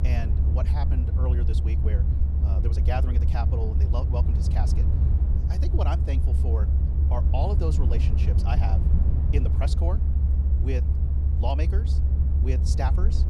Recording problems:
wrong speed, natural pitch; too fast; 1.5 times normal speed
low rumble; loud; throughout; 4 dB below the speech

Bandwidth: 15 kHz